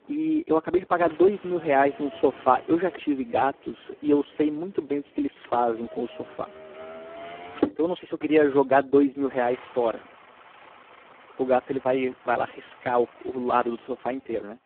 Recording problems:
phone-call audio; poor line; nothing above 3.5 kHz
traffic noise; noticeable; throughout; 15 dB below the speech

